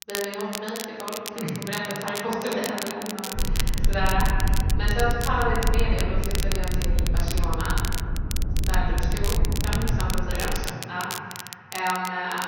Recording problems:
room echo; strong; dies away in 1.9 s
off-mic speech; far
high frequencies cut off; noticeable; nothing above 6.5 kHz
crackle, like an old record; loud; 5 dB below the speech
low rumble; noticeable; from 3.5 to 11 s; 10 dB below the speech

